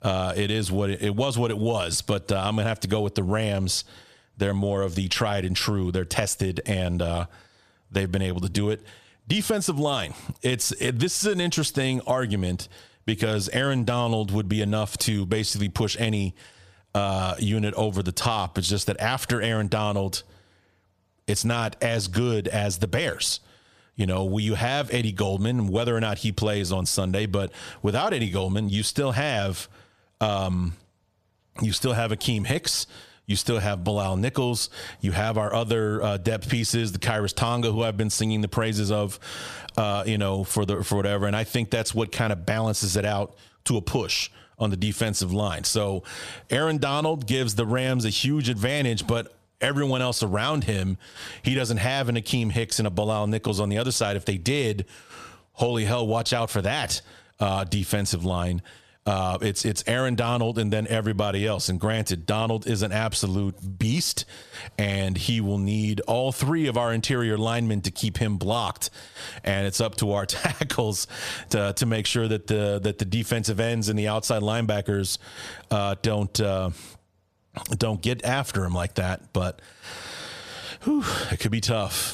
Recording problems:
squashed, flat; somewhat

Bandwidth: 14.5 kHz